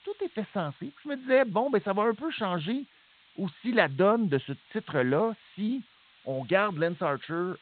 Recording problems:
high frequencies cut off; severe; nothing above 4 kHz
hiss; faint; throughout; 30 dB below the speech

